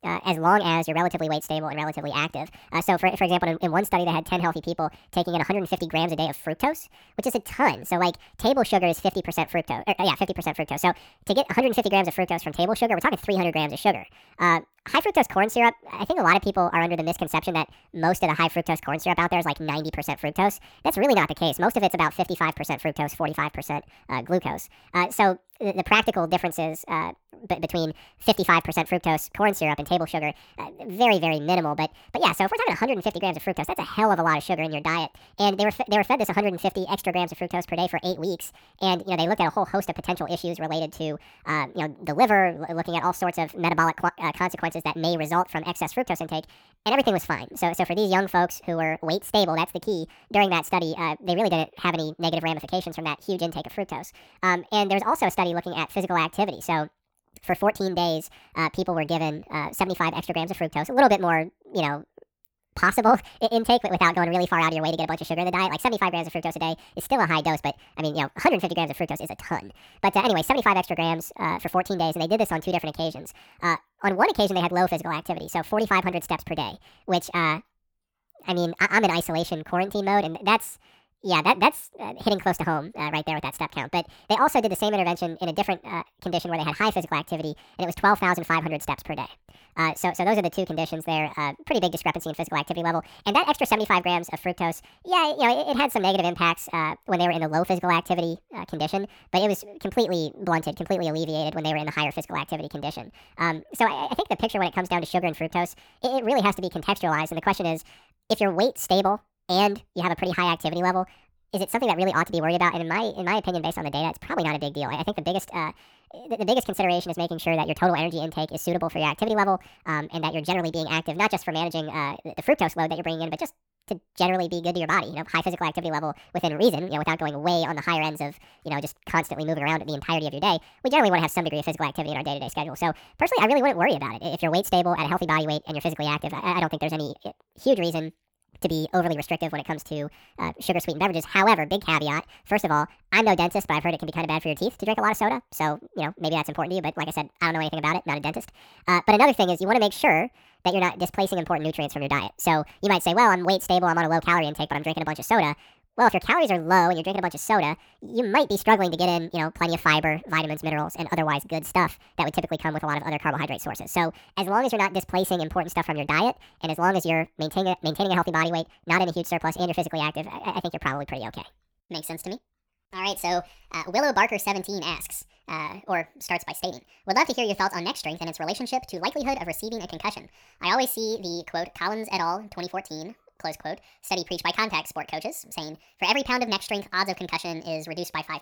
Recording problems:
wrong speed and pitch; too fast and too high; 1.6 times normal speed

